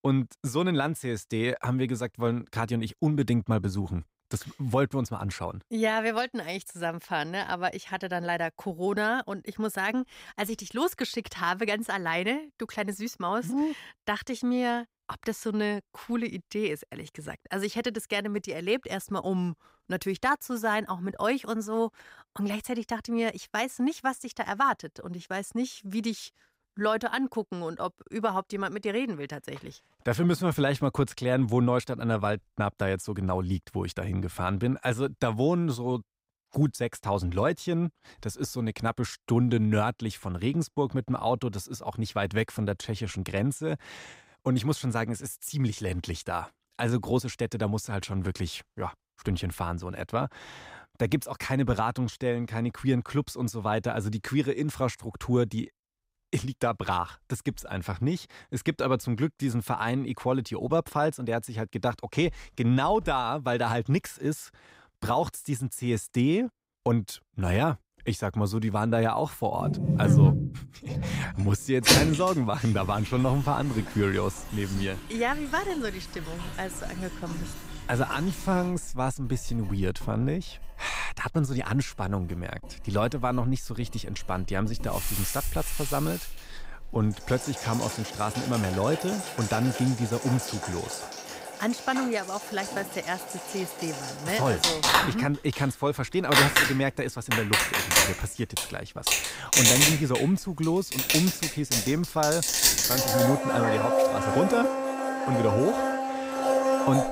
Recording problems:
household noises; very loud; from 1:10 on; 3 dB above the speech

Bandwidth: 15.5 kHz